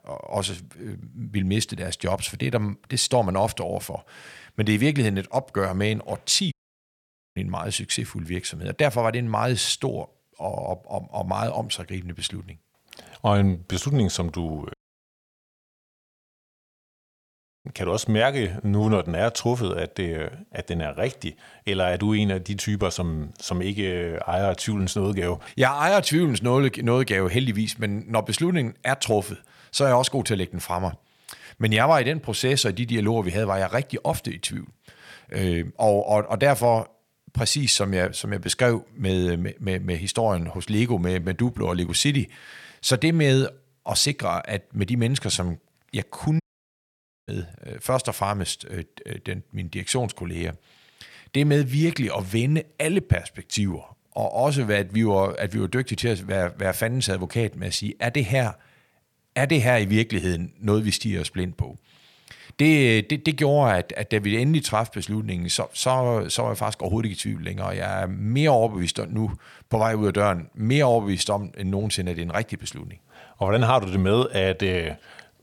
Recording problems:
audio cutting out; at 6.5 s for 1 s, at 15 s for 3 s and at 46 s for 1 s

